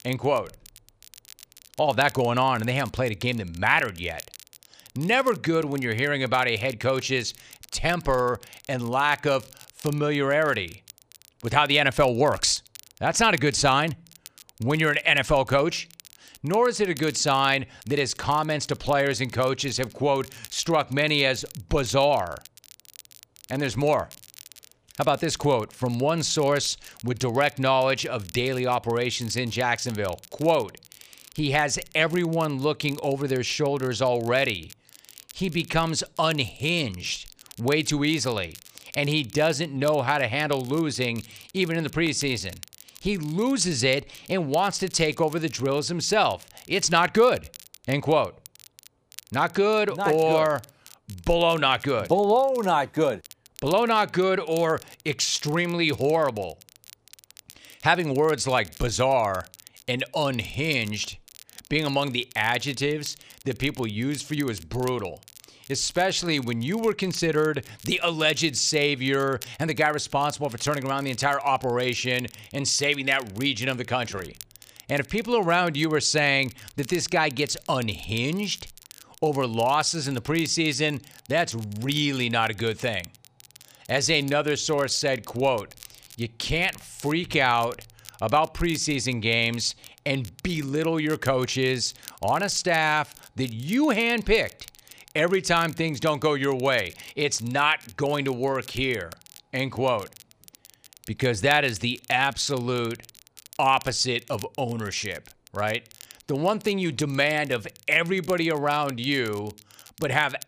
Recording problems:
crackle, like an old record; faint; 20 dB below the speech

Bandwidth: 15 kHz